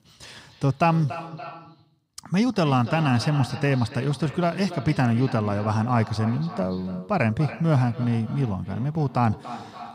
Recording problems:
echo of what is said; noticeable; throughout; 280 ms later, 15 dB below the speech

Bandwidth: 15.5 kHz